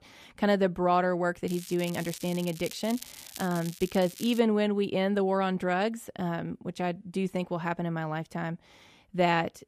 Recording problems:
crackling; noticeable; from 1.5 to 4.5 s; 15 dB below the speech

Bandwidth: 14.5 kHz